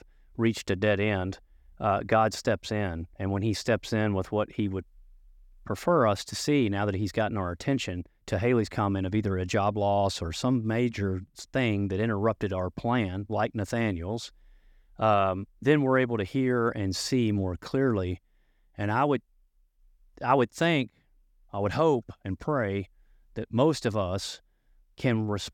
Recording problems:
none

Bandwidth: 17.5 kHz